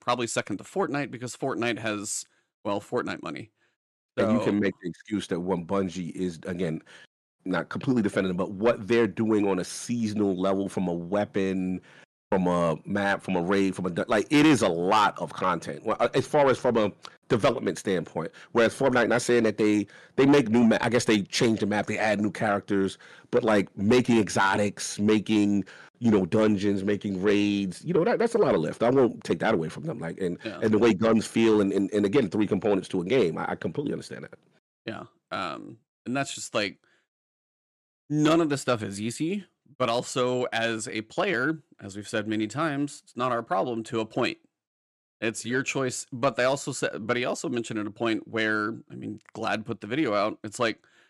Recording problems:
distortion; slight; 10 dB below the speech

